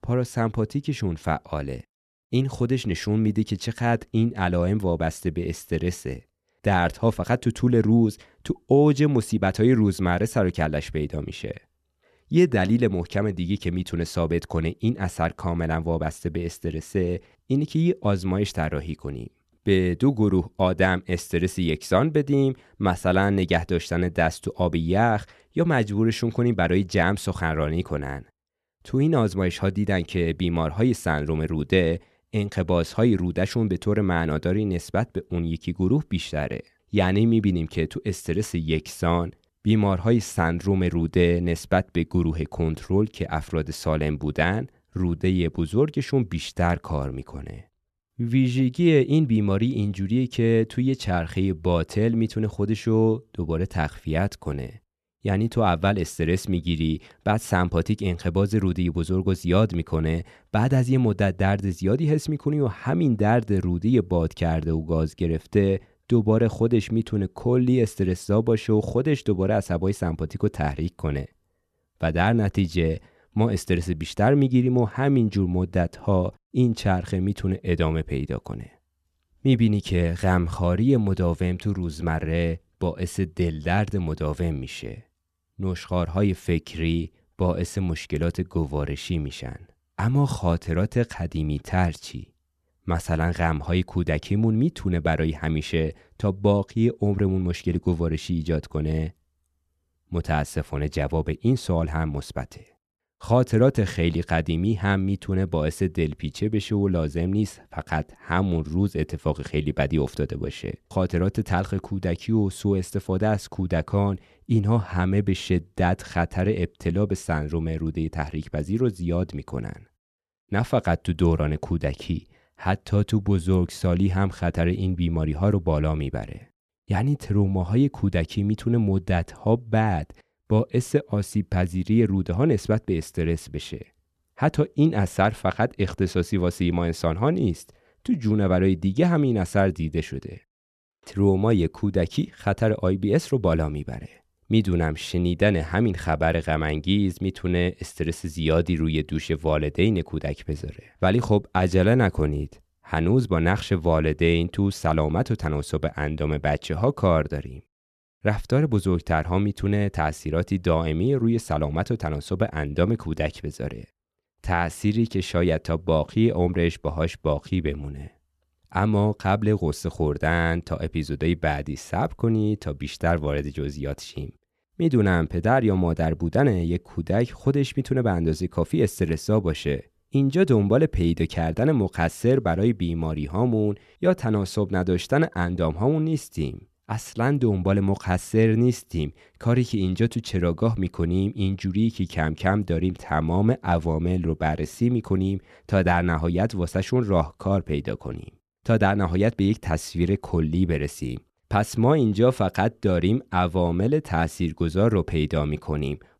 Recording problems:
none

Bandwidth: 13.5 kHz